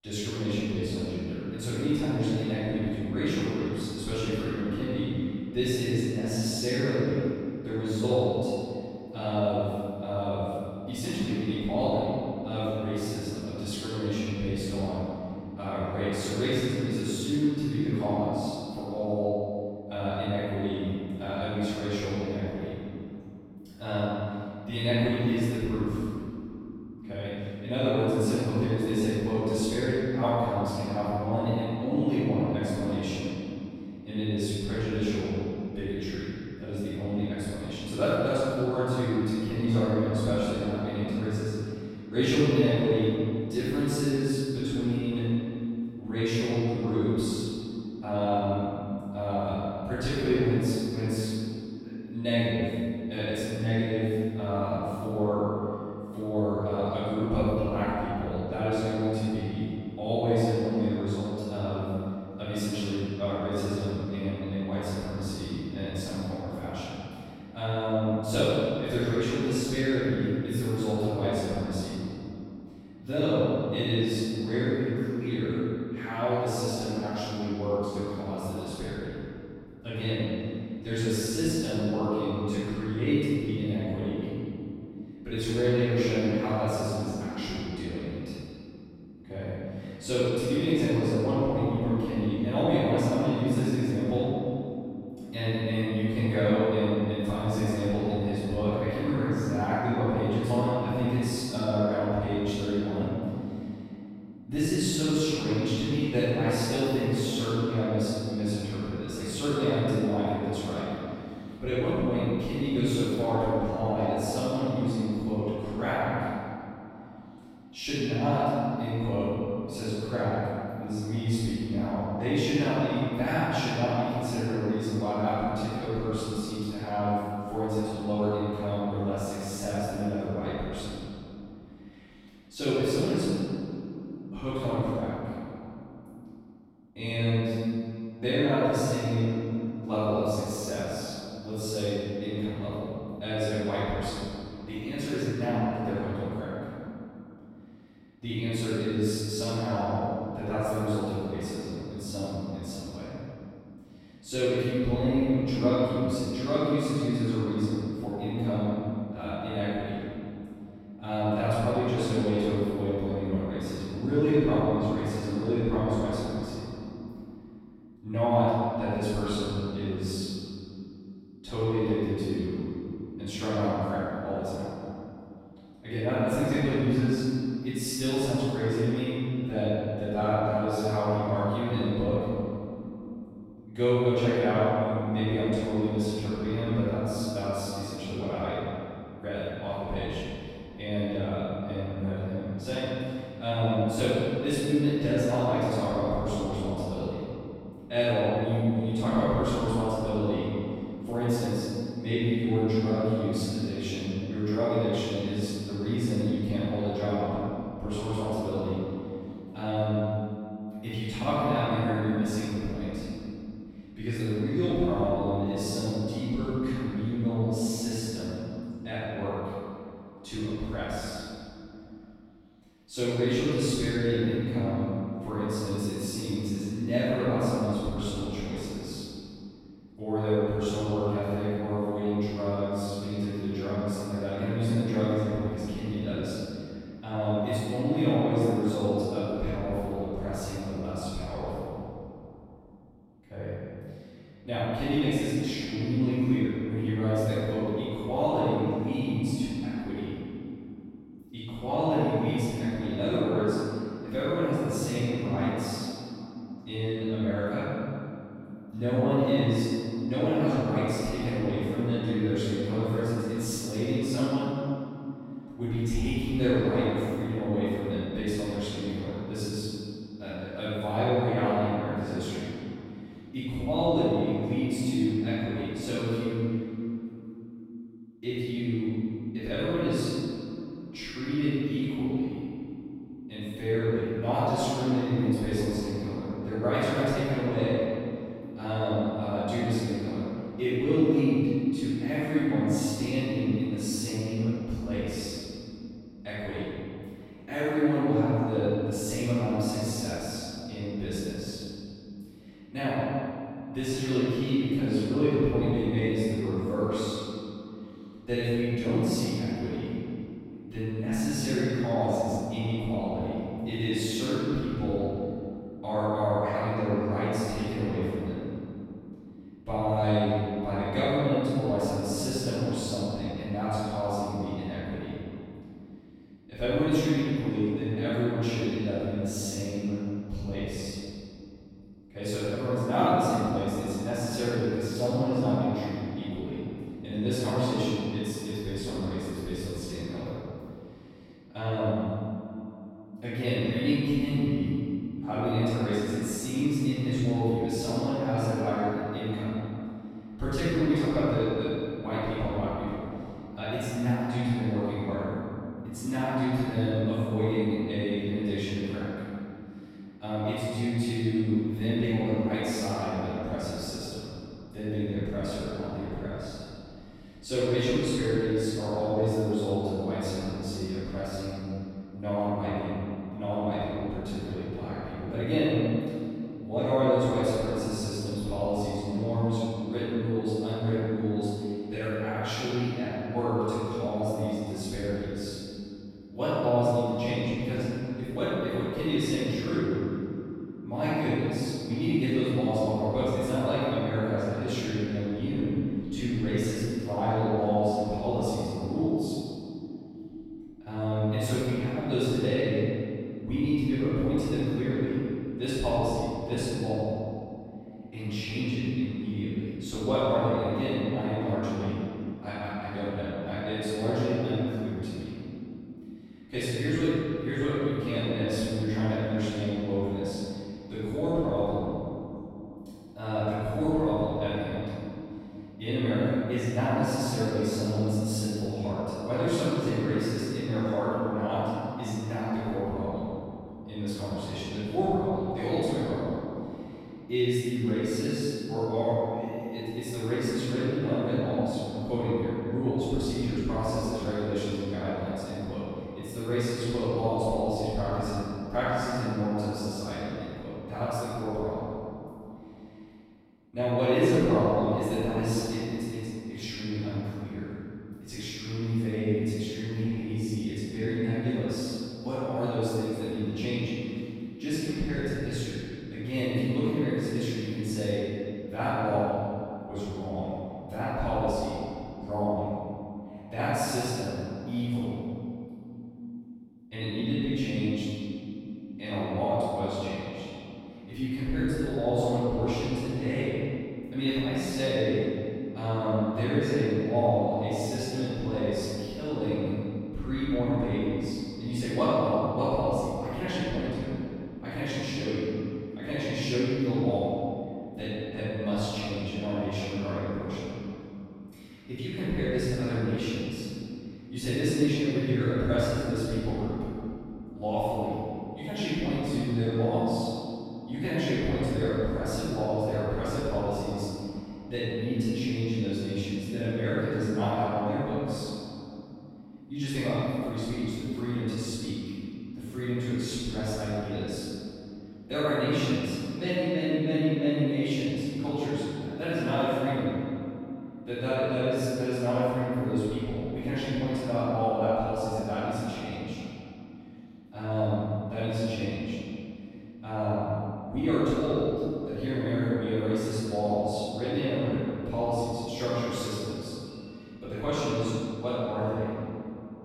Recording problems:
room echo; strong; dies away in 3 s
off-mic speech; far

